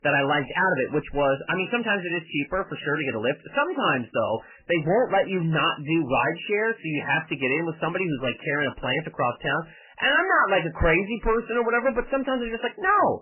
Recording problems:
garbled, watery; badly; nothing above 3 kHz
distortion; slight; 9 dB below the speech

